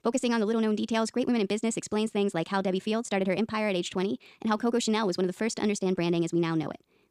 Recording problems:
wrong speed, natural pitch; too fast; 1.6 times normal speed

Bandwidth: 15 kHz